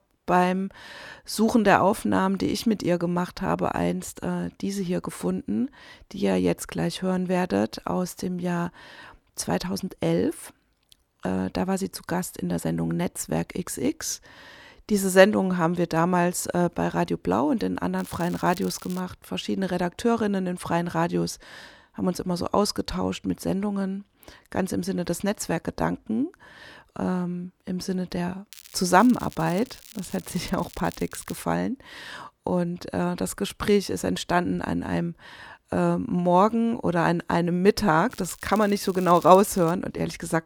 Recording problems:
crackling; noticeable; from 18 to 19 s, from 29 to 31 s and from 38 to 40 s; 20 dB below the speech

